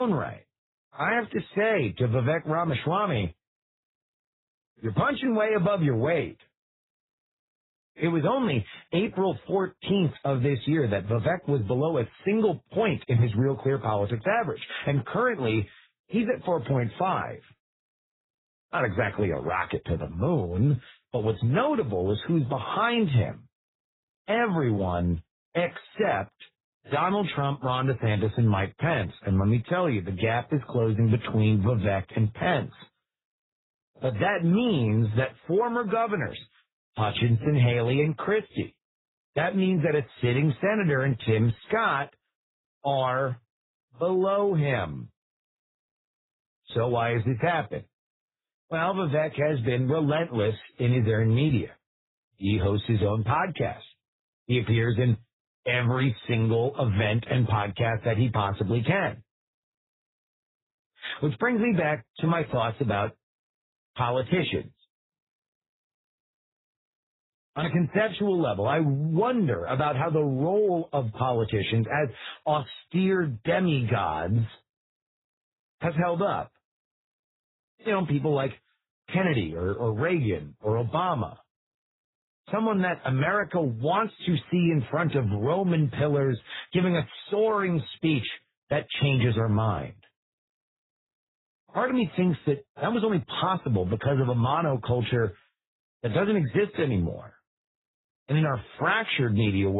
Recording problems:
garbled, watery; badly; nothing above 4 kHz
abrupt cut into speech; at the start and the end

